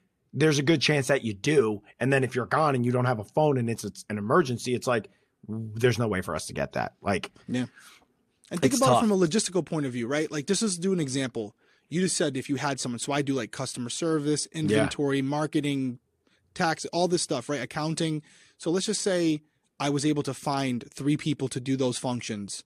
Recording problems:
none

